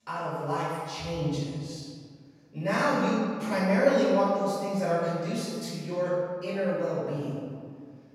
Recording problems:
room echo; strong; dies away in 1.8 s
off-mic speech; far

